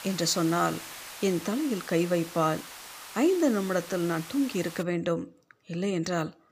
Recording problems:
hiss; noticeable; until 5 s; 15 dB below the speech

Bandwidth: 15 kHz